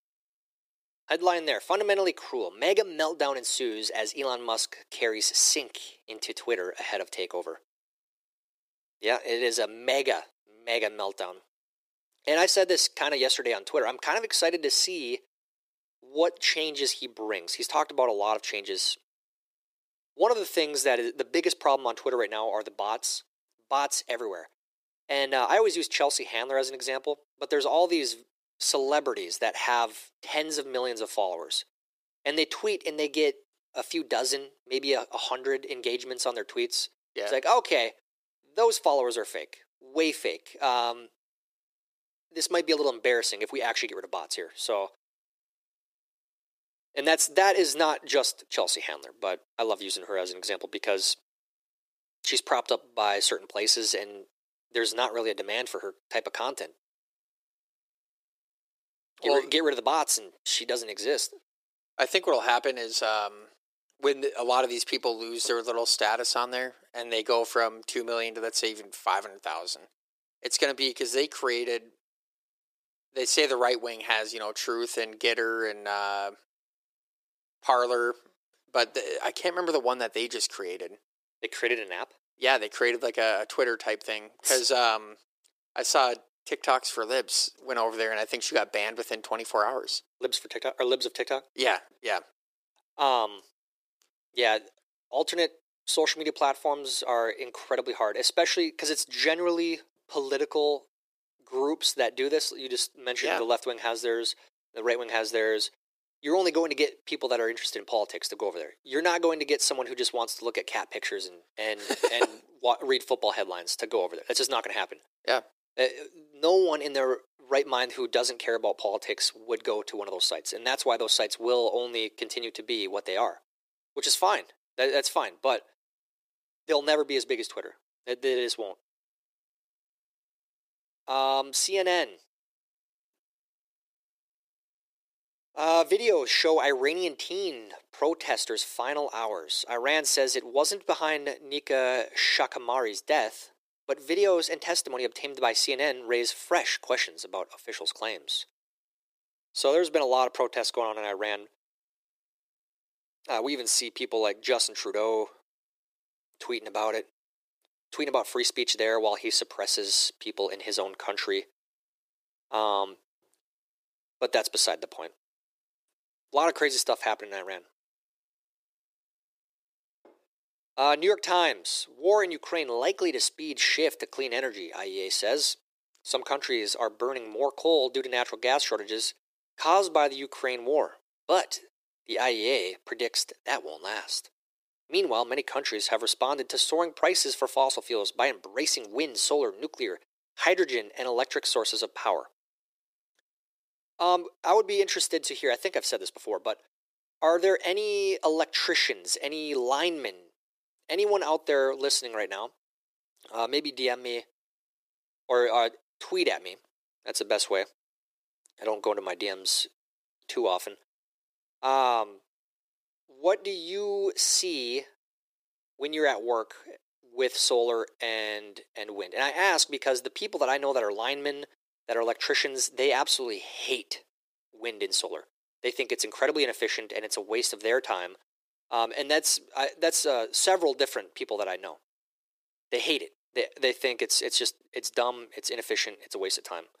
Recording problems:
thin; very; fading below 350 Hz

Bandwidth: 15 kHz